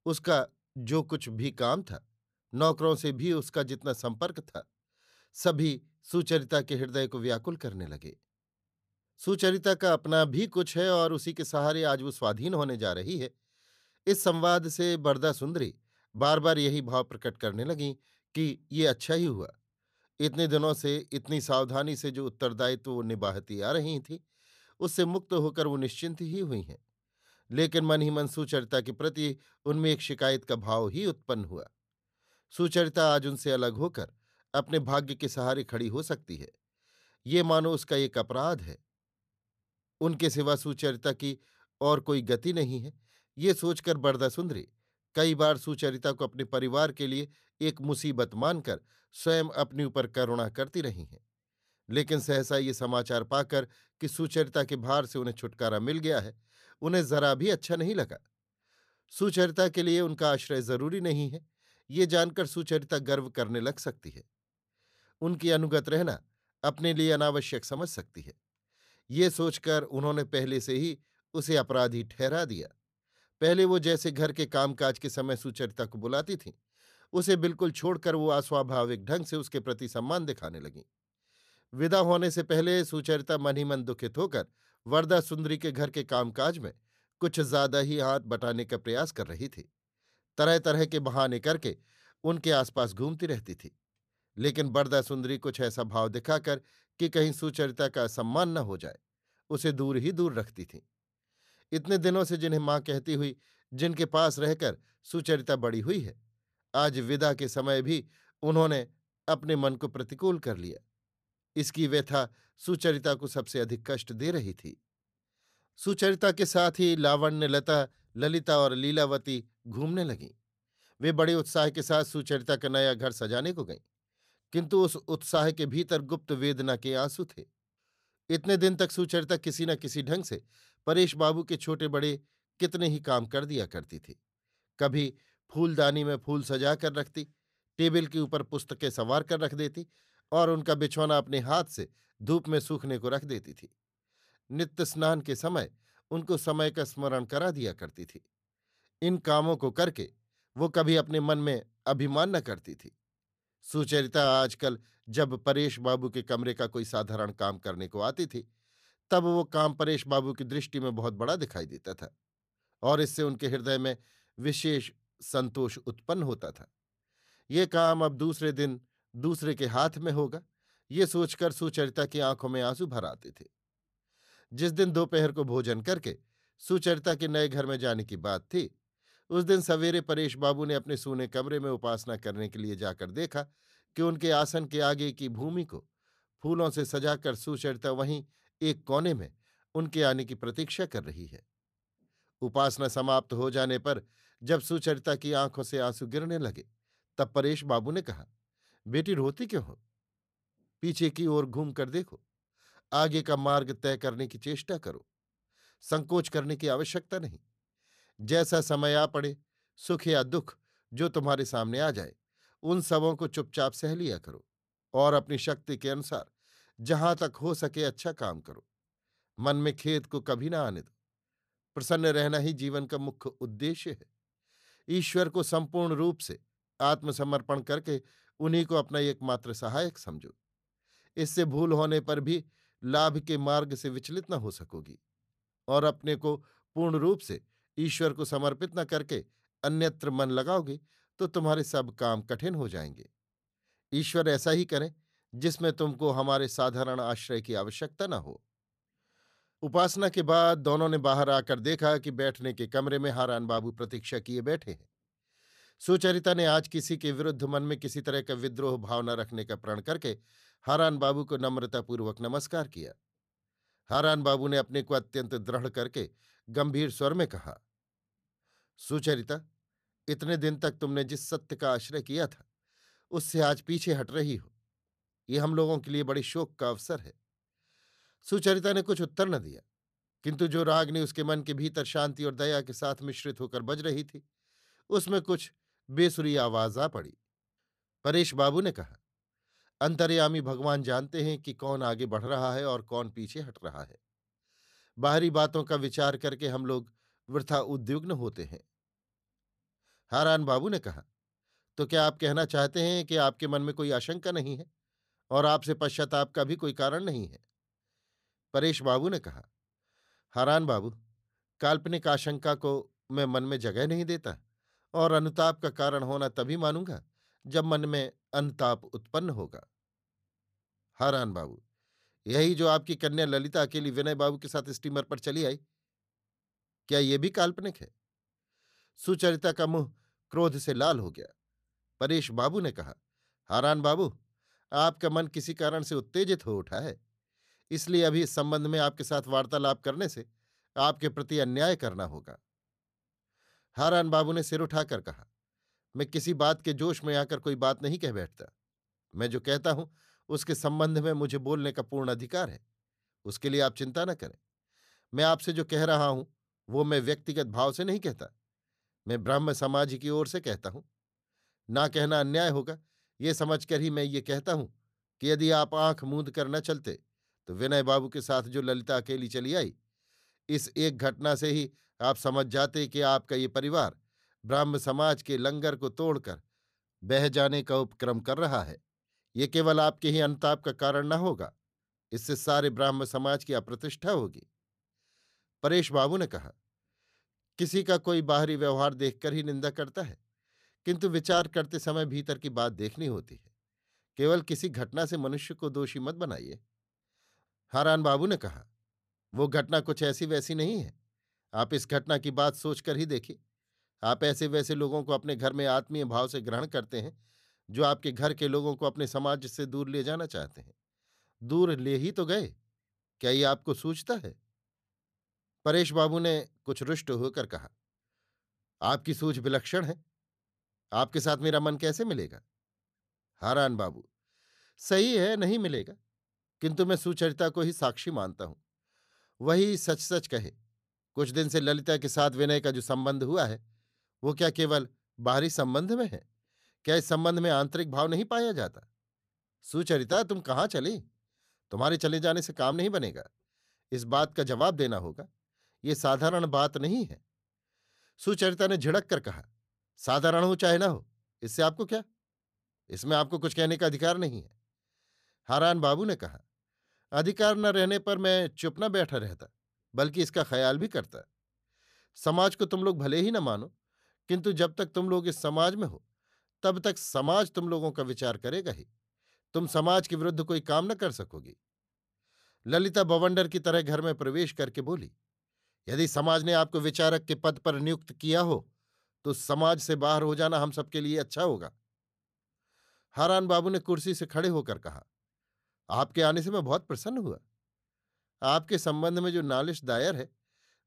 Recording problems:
none

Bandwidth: 14.5 kHz